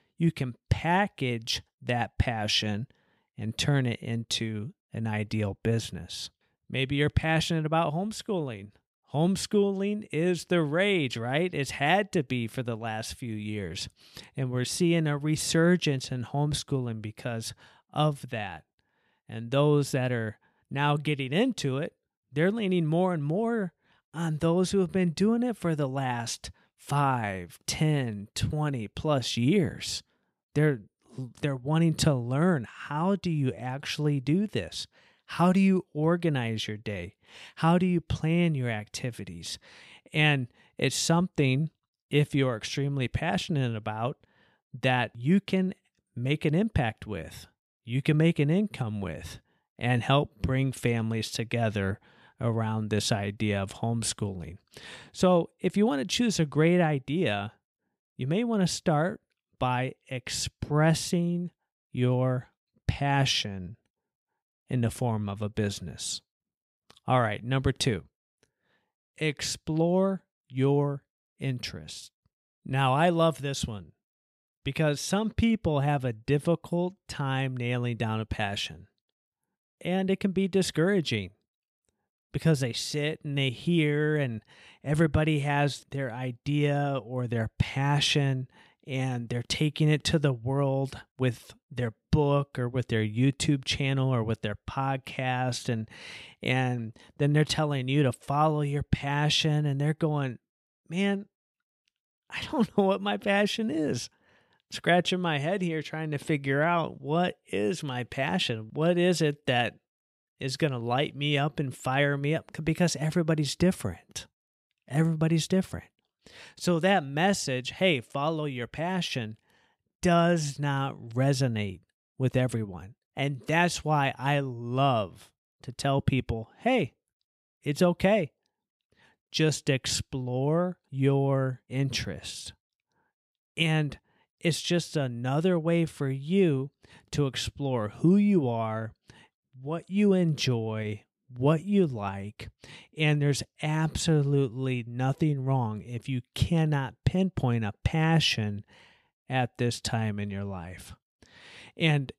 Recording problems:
none

